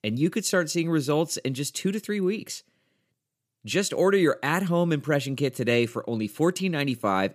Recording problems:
none

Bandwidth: 15 kHz